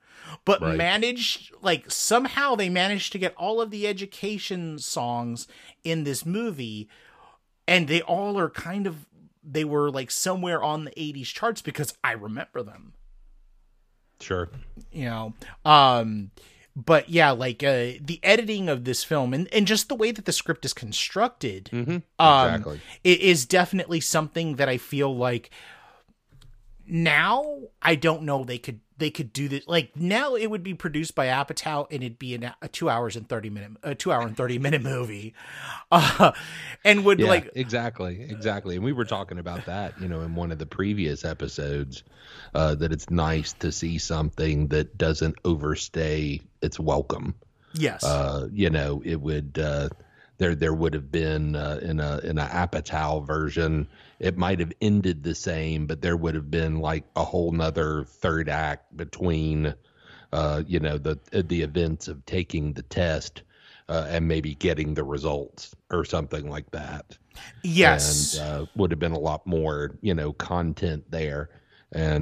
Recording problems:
abrupt cut into speech; at the end

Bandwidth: 15 kHz